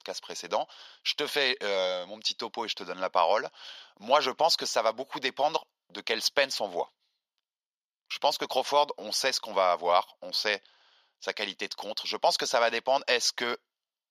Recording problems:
thin; very; fading below 750 Hz

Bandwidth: 15 kHz